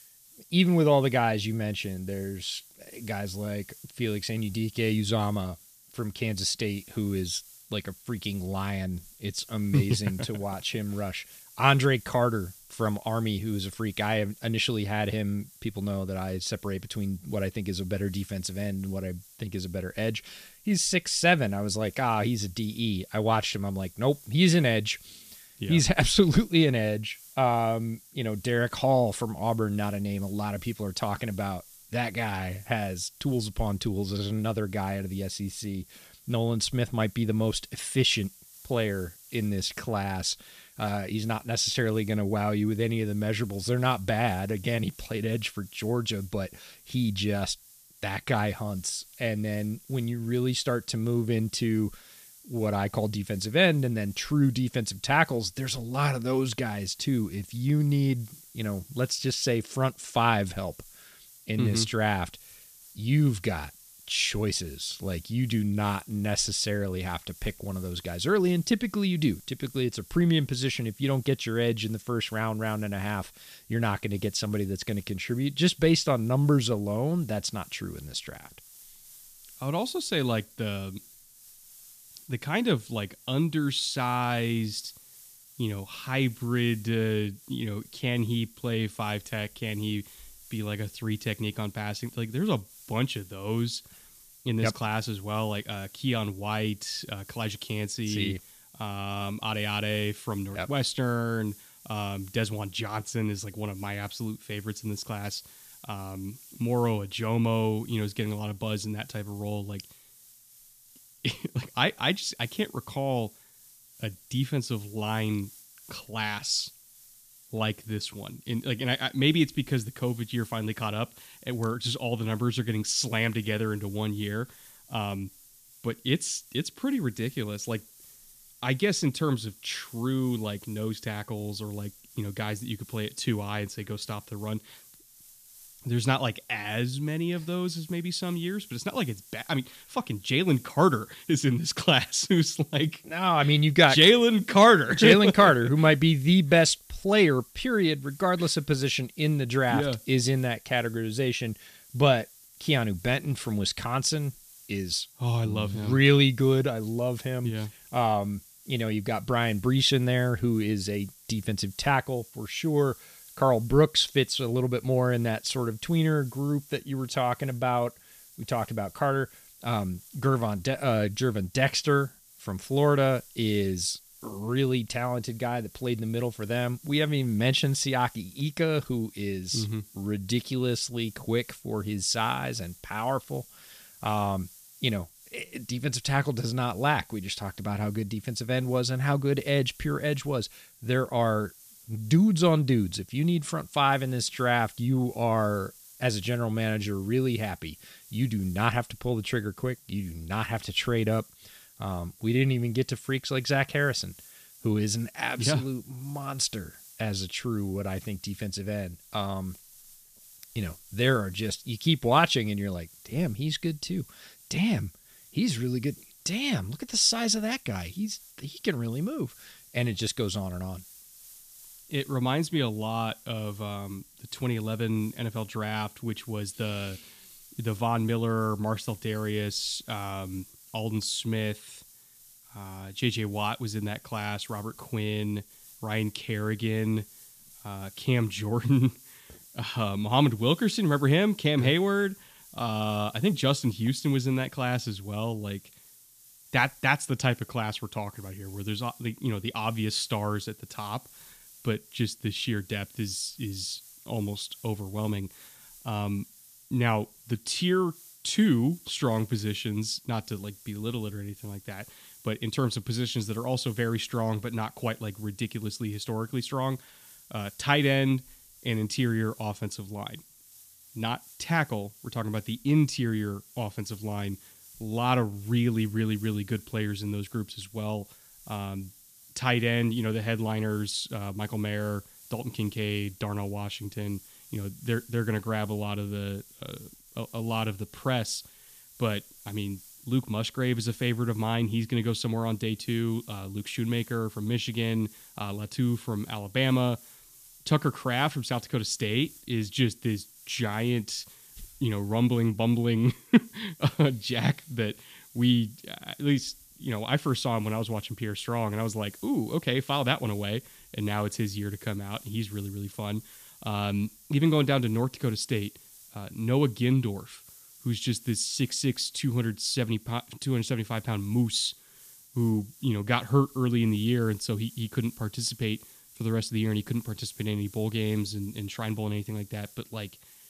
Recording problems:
hiss; faint; throughout; 20 dB below the speech

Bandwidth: 14.5 kHz